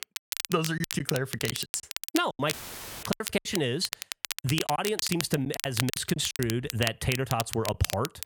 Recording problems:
squashed, flat; somewhat
crackle, like an old record; loud; 5 dB below the speech
choppy; very; 12% of the speech affected
audio cutting out; filled with static; at 2.5 s for 0.5 s

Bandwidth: 18 kHz